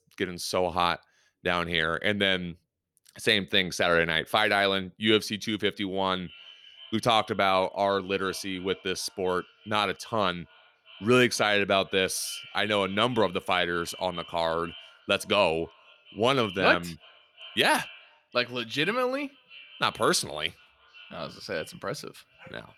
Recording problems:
echo of what is said; faint; from 6 s on; 370 ms later, 20 dB below the speech

